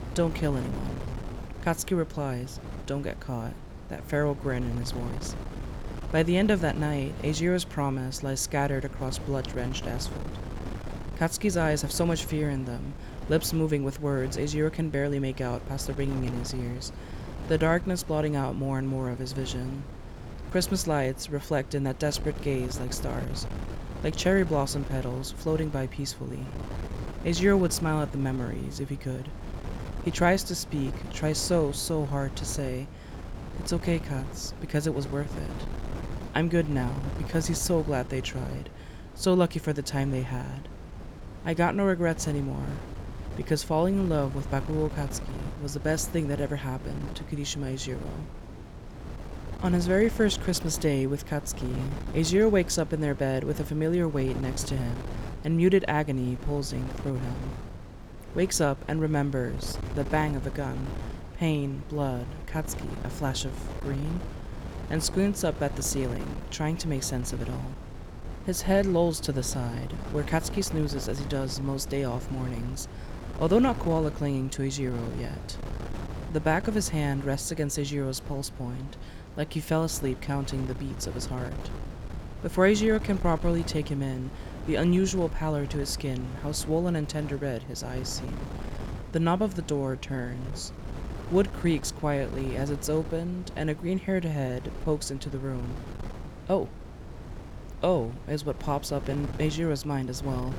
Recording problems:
wind noise on the microphone; occasional gusts; 15 dB below the speech

